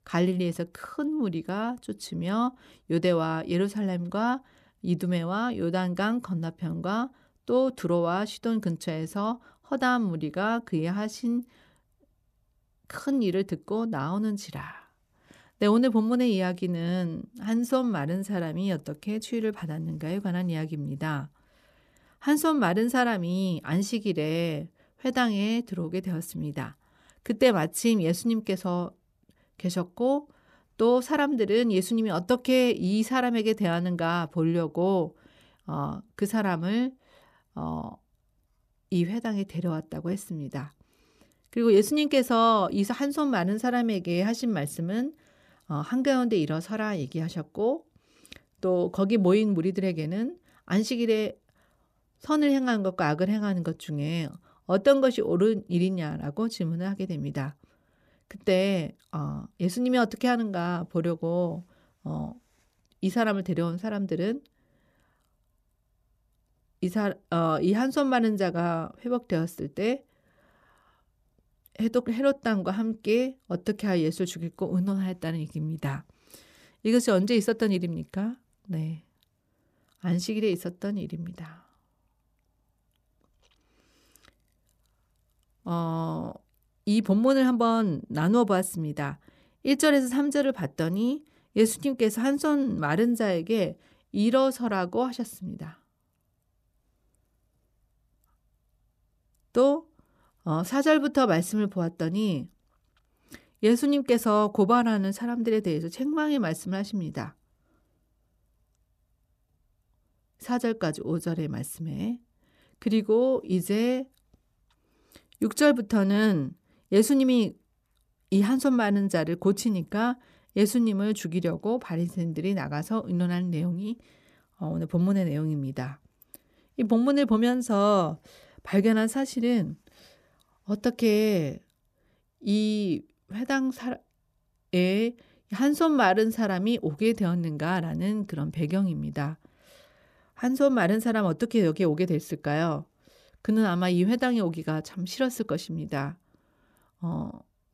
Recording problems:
none

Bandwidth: 14.5 kHz